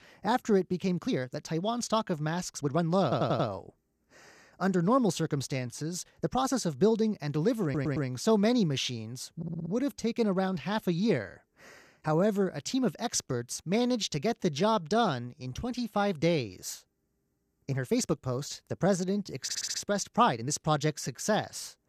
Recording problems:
uneven, jittery; strongly; from 1 to 21 s
audio stuttering; 4 times, first at 3 s

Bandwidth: 14.5 kHz